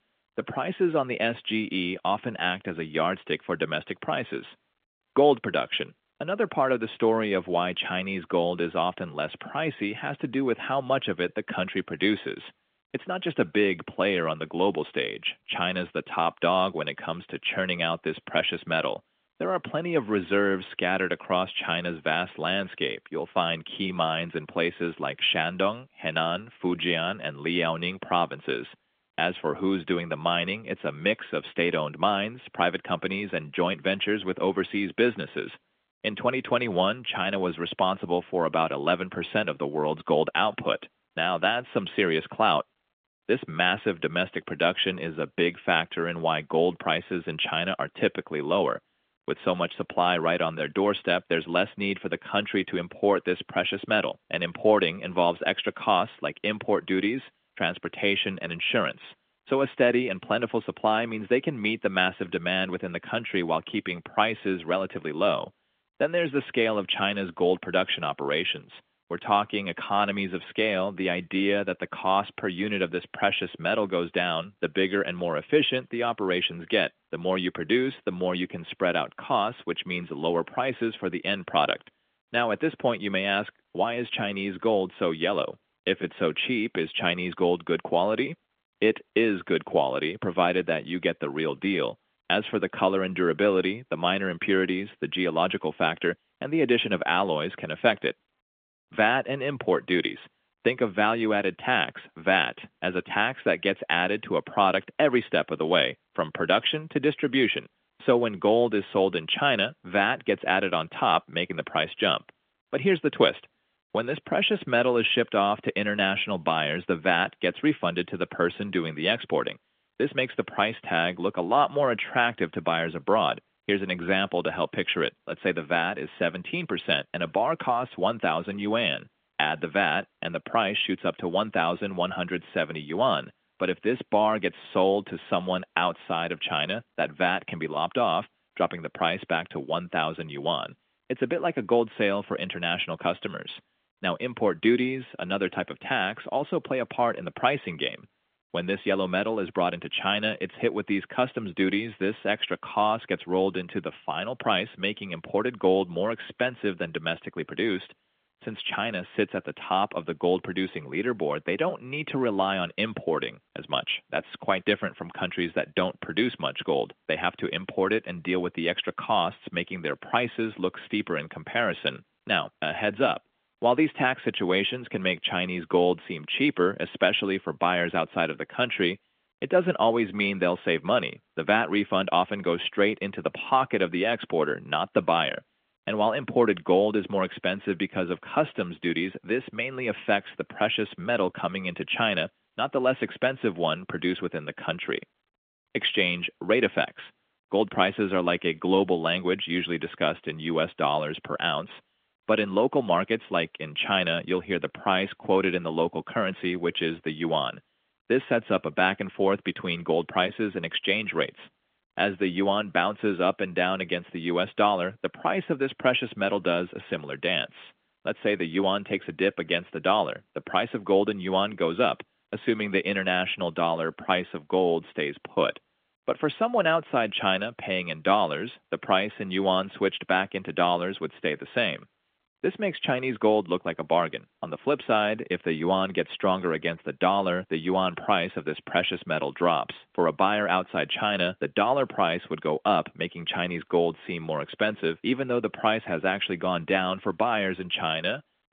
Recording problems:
phone-call audio; nothing above 3.5 kHz

